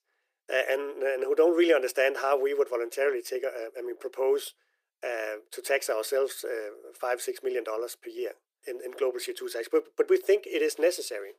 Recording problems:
thin; very; fading below 350 Hz

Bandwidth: 15 kHz